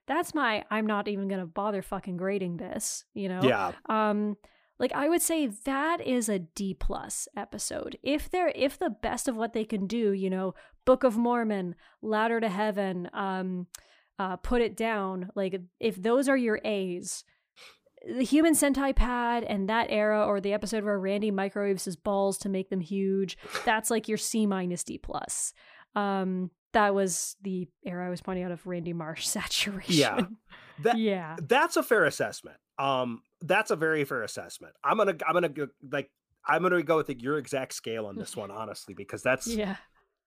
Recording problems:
none

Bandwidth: 15 kHz